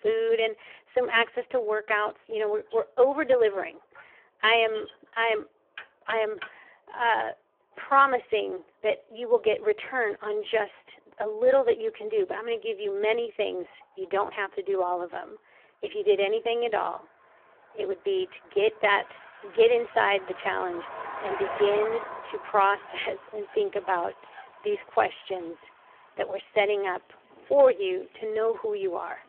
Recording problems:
phone-call audio; poor line; nothing above 3 kHz
traffic noise; noticeable; throughout; 15 dB below the speech
household noises; faint; throughout; 25 dB below the speech

